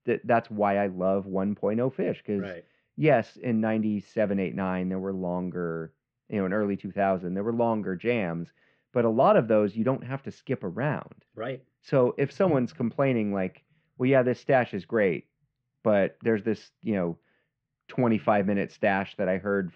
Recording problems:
muffled; very; fading above 3 kHz

